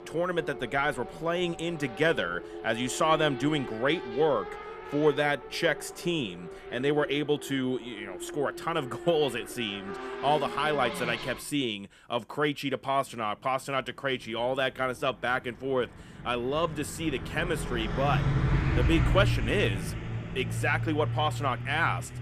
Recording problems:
traffic noise; loud; throughout; 6 dB below the speech

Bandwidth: 14.5 kHz